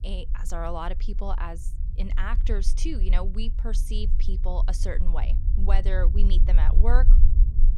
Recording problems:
low rumble; noticeable; throughout; 10 dB below the speech

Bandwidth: 17.5 kHz